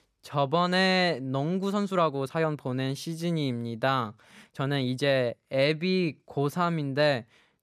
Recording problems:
uneven, jittery; strongly; from 1.5 to 5.5 s

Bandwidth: 14.5 kHz